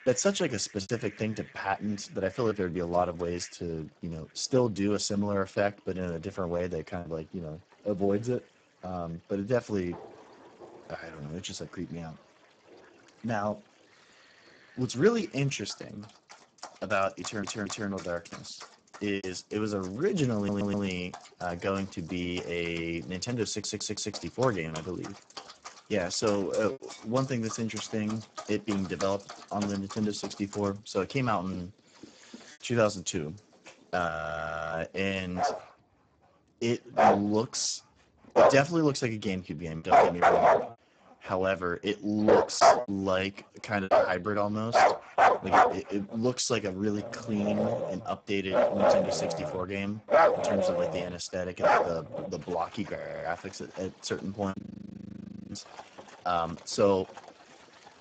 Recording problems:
garbled, watery; badly; nothing above 7.5 kHz
animal sounds; very loud; throughout; 5 dB above the speech
choppy; occasionally; 2% of the speech affected
audio stuttering; at 17 s, at 20 s and at 23 s
audio freezing; at 34 s for 0.5 s, at 53 s and at 55 s for 1 s

